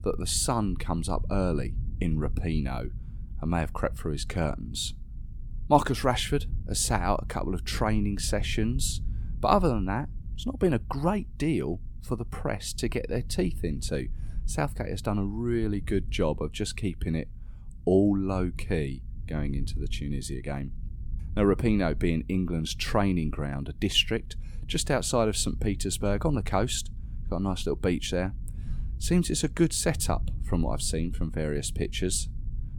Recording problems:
low rumble; faint; throughout; 25 dB below the speech

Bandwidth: 17.5 kHz